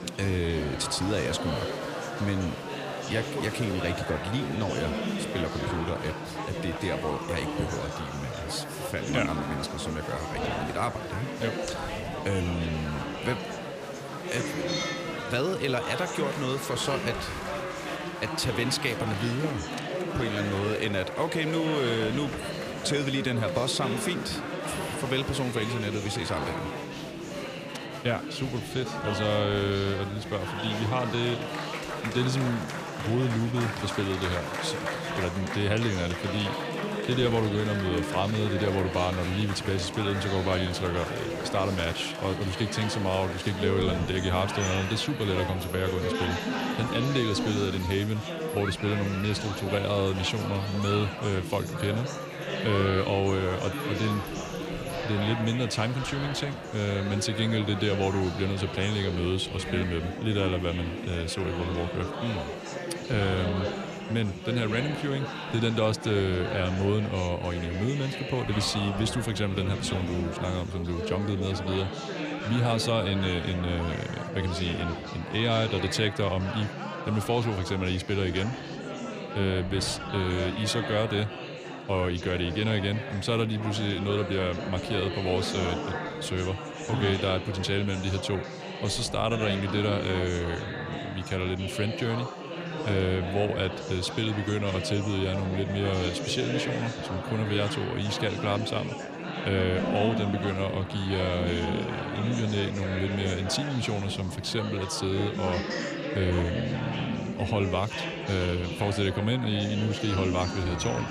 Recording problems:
chatter from many people; loud; throughout; 4 dB below the speech

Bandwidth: 15 kHz